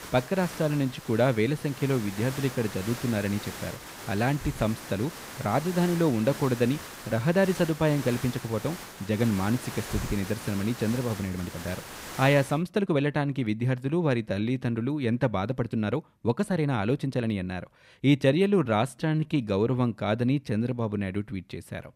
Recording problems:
hiss; noticeable; until 13 s; 10 dB below the speech
uneven, jittery; strongly; from 0.5 to 21 s

